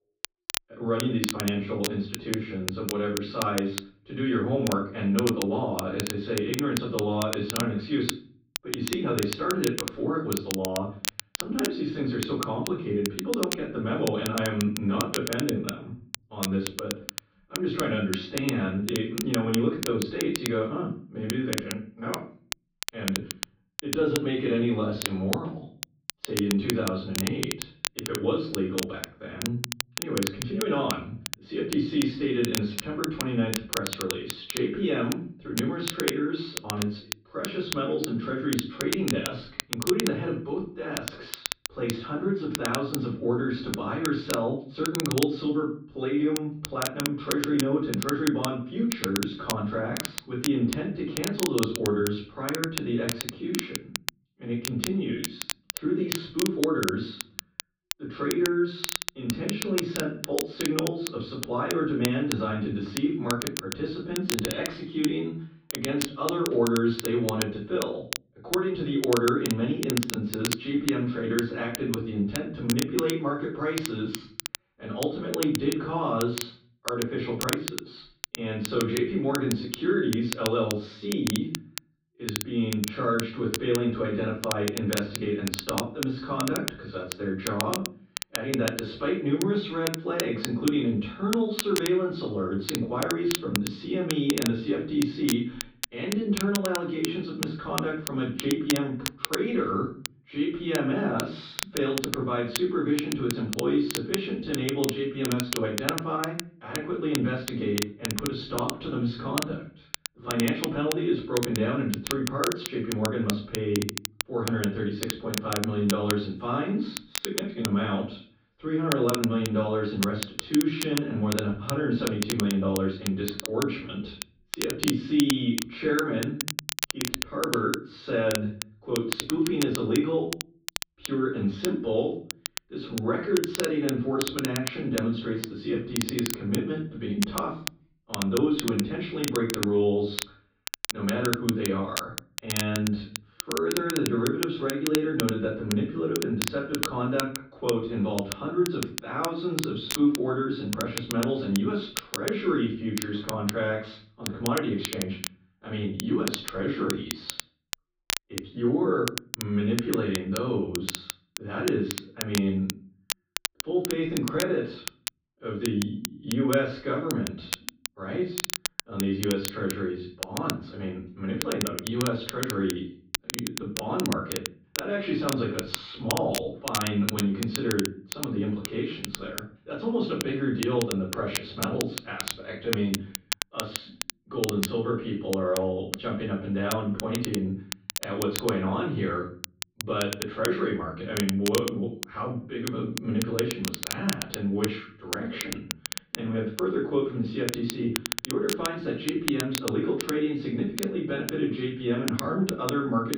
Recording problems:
off-mic speech; far
room echo; noticeable; dies away in 0.4 s
muffled; slightly; fading above 4 kHz
crackle, like an old record; loud; 6 dB below the speech

